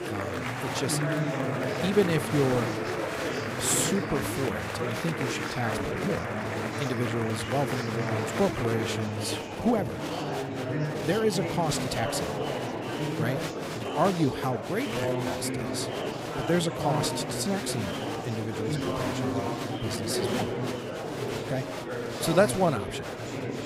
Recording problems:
murmuring crowd; loud; throughout; 1 dB below the speech
uneven, jittery; strongly; from 2 to 23 s

